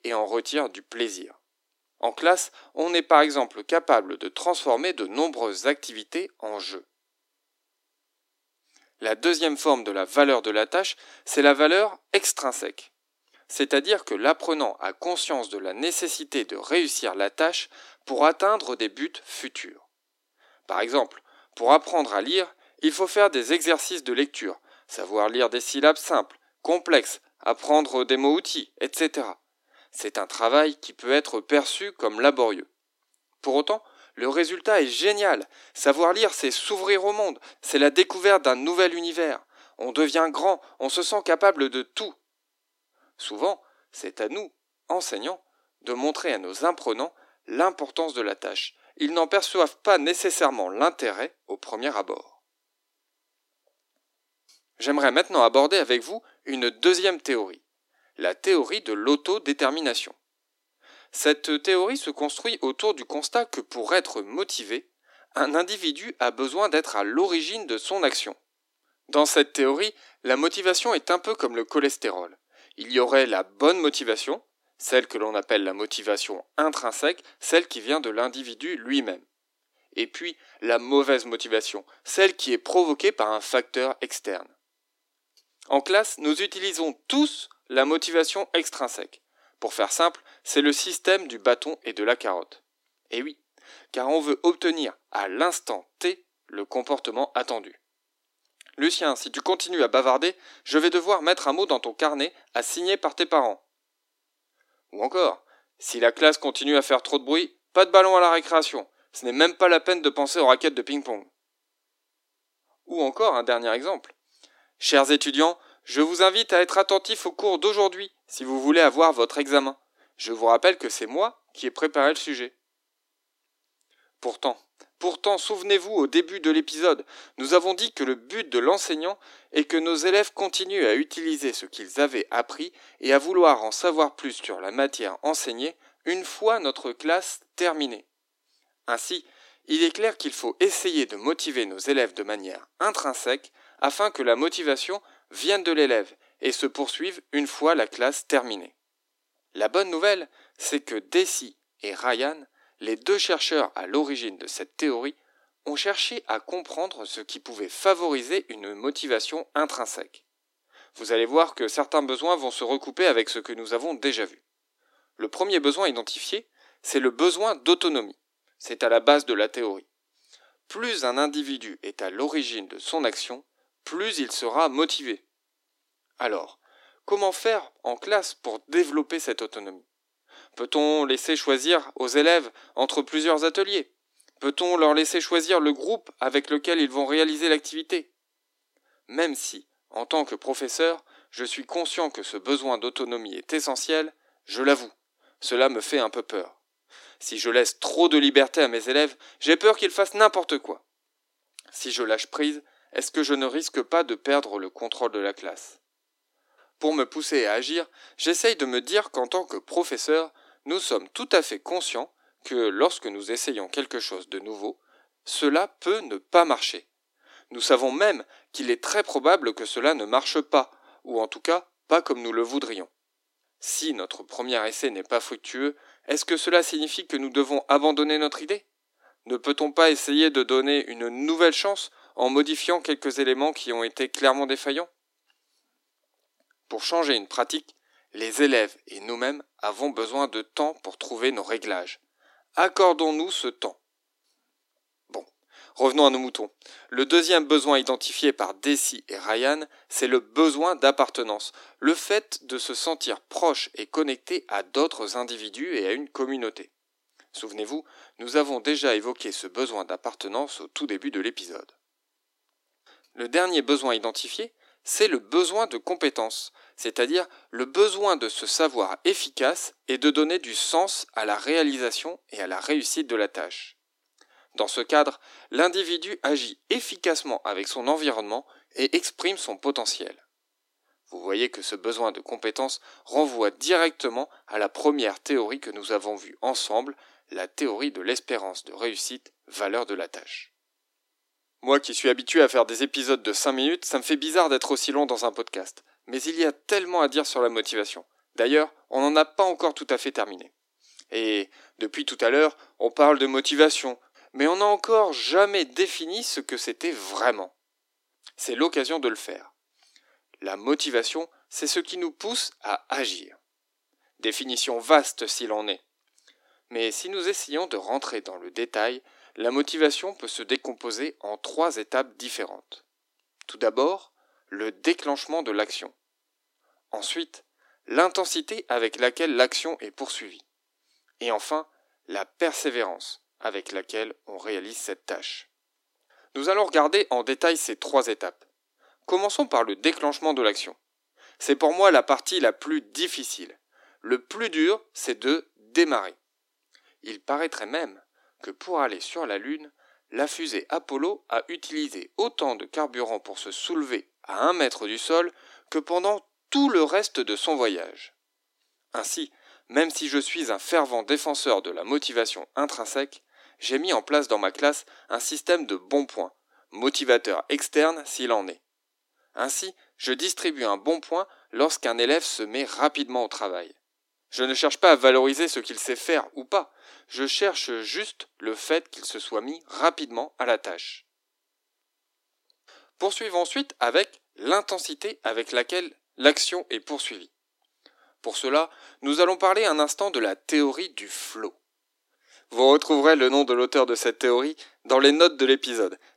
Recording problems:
thin; somewhat; fading below 300 Hz

